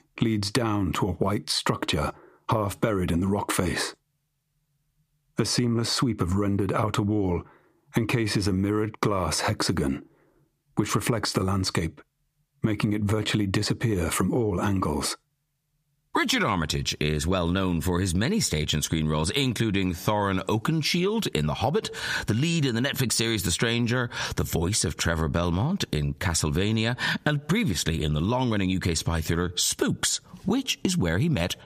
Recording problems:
squashed, flat; heavily

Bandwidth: 15 kHz